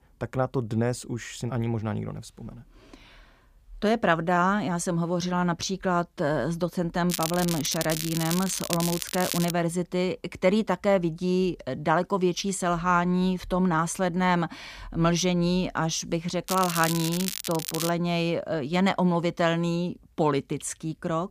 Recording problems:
crackling; loud; from 7 to 9.5 s and from 16 to 18 s; 5 dB below the speech

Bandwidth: 15 kHz